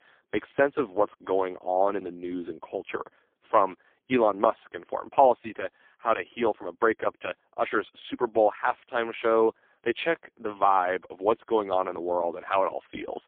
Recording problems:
phone-call audio; poor line; nothing above 3.5 kHz

